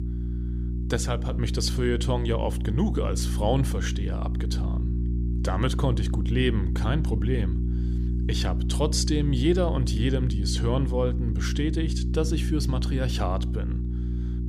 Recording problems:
electrical hum; loud; throughout; 60 Hz, 9 dB below the speech

